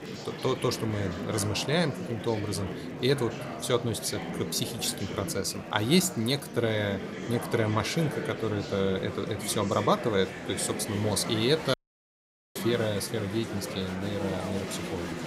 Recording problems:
murmuring crowd; loud; throughout; 7 dB below the speech
audio cutting out; at 12 s for 1 s

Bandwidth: 15.5 kHz